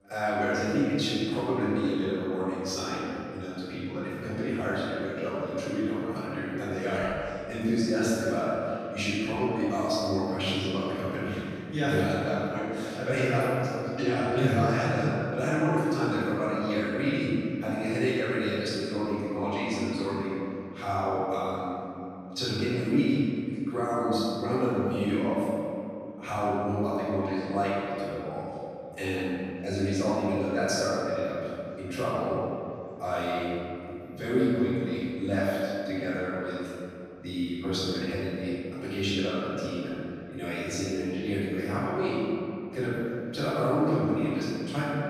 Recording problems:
room echo; strong; dies away in 2.4 s
off-mic speech; far
voice in the background; faint; throughout; 30 dB below the speech

